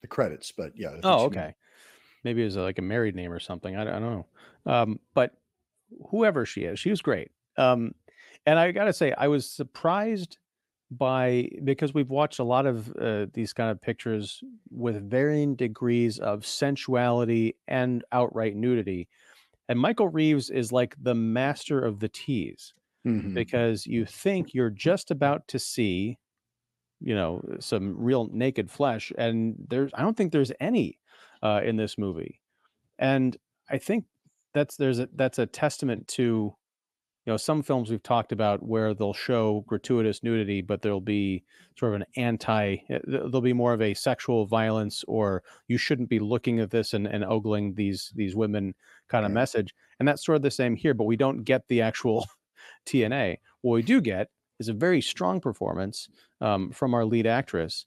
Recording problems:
none

